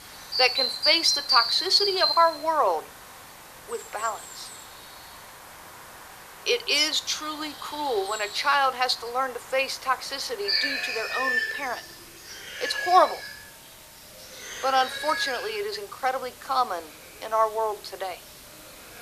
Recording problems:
thin; very; fading below 400 Hz
animal sounds; loud; throughout; 1 dB below the speech
hiss; faint; throughout; 20 dB below the speech

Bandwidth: 14.5 kHz